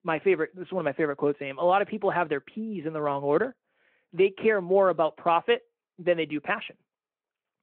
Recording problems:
phone-call audio

